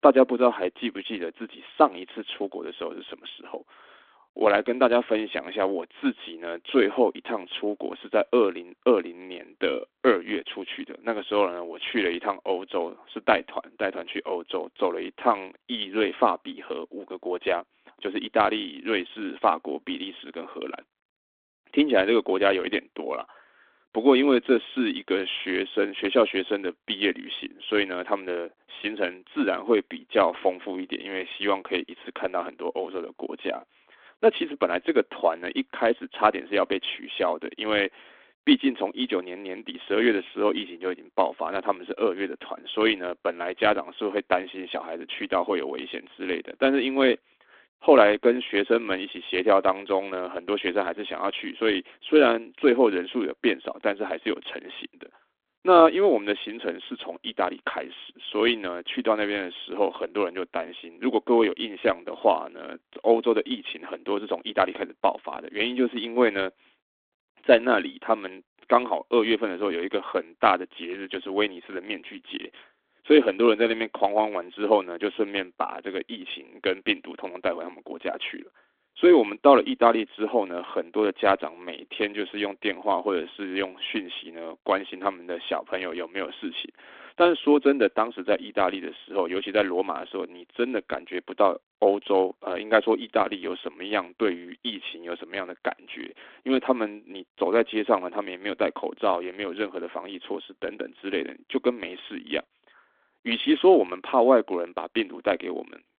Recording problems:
phone-call audio; nothing above 3.5 kHz

